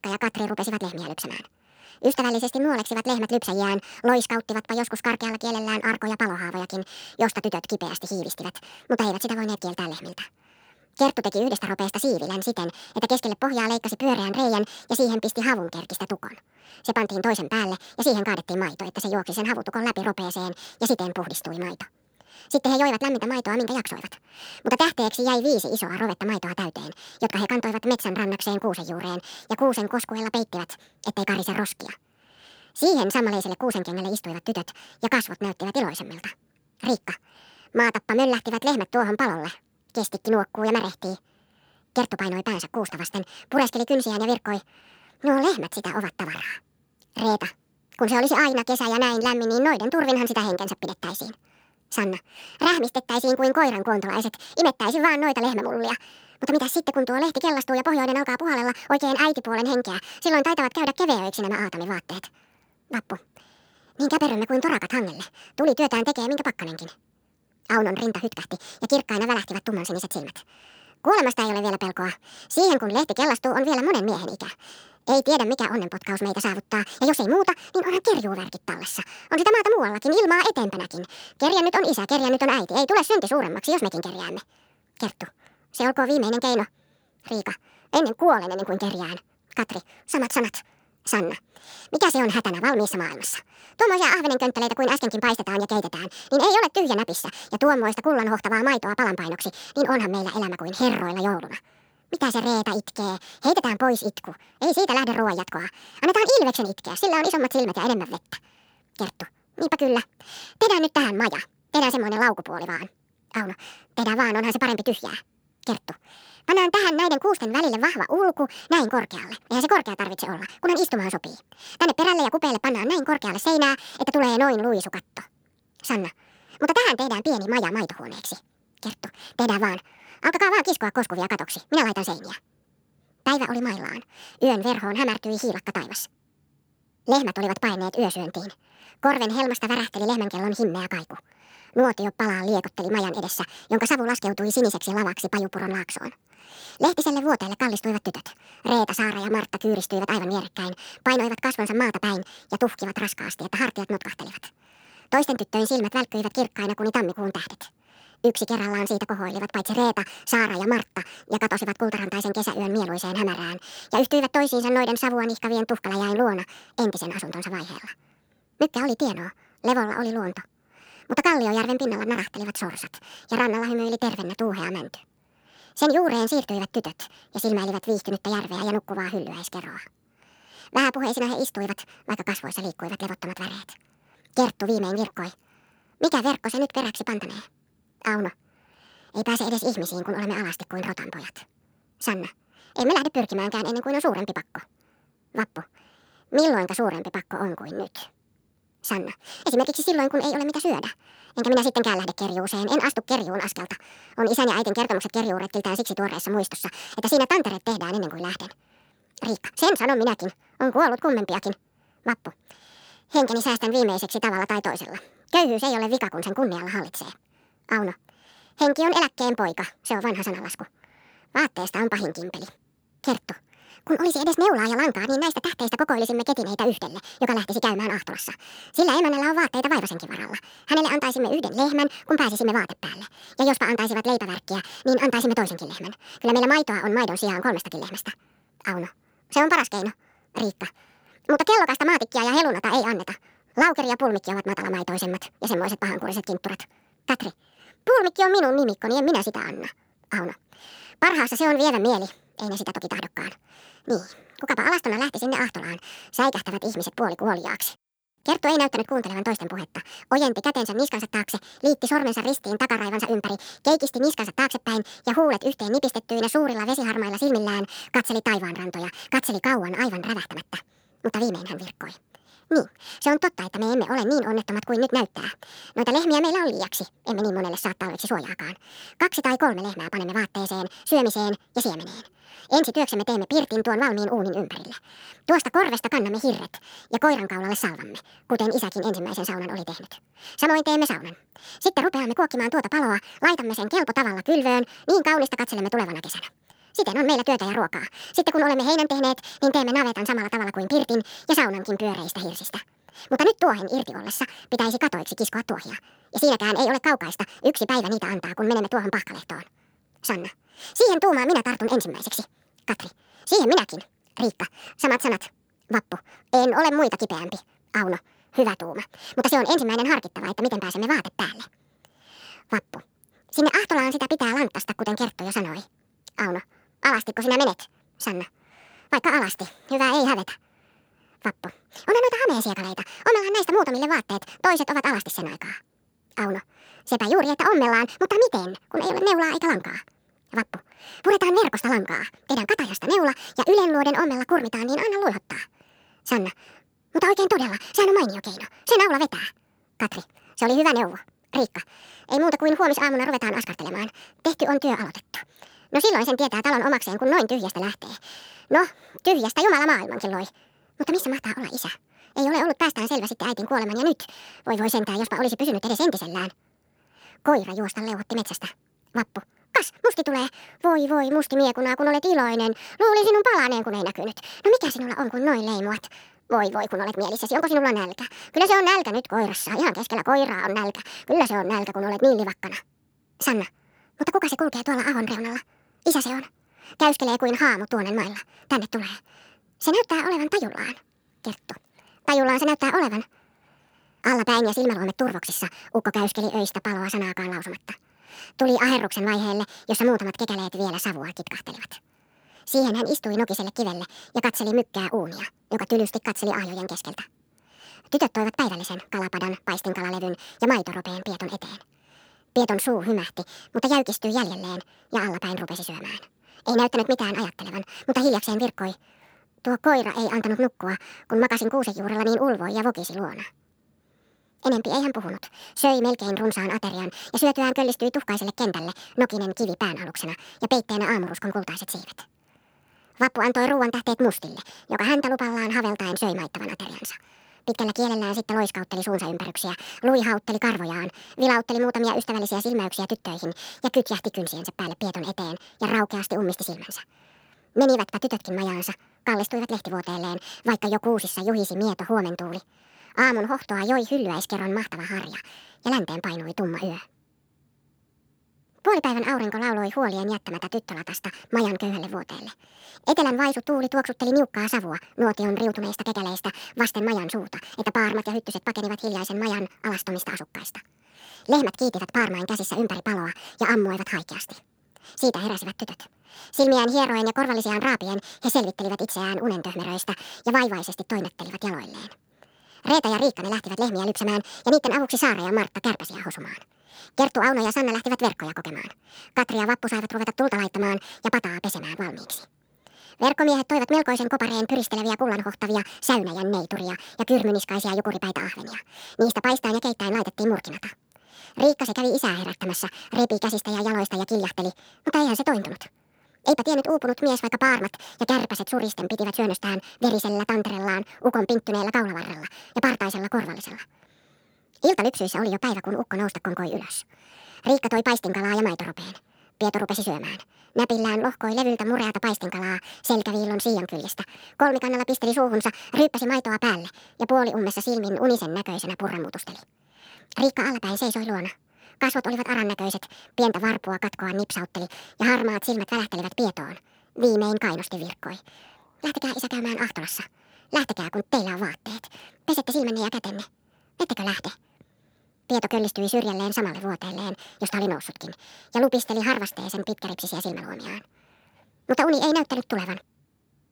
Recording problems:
wrong speed and pitch; too fast and too high; 1.6 times normal speed

